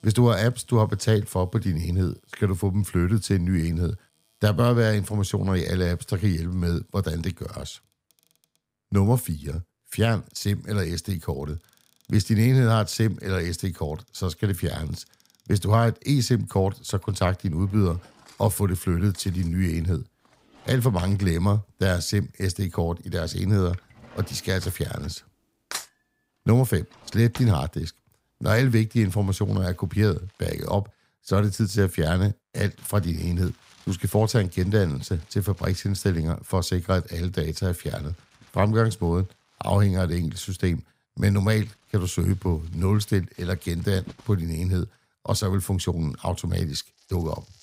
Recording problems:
household noises; faint; throughout; 25 dB below the speech

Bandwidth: 15.5 kHz